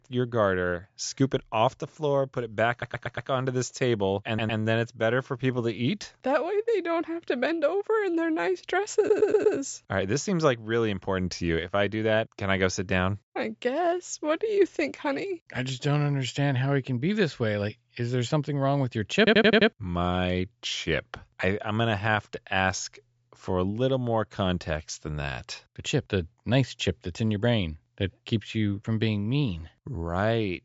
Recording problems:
high frequencies cut off; noticeable; nothing above 8 kHz
audio stuttering; 4 times, first at 2.5 s

